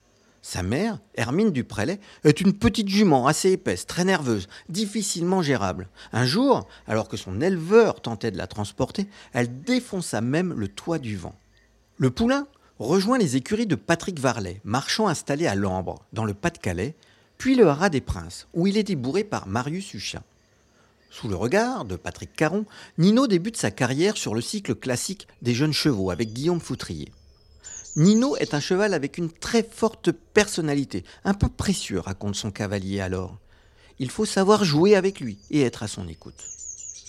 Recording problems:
animal sounds; noticeable; throughout; 20 dB below the speech

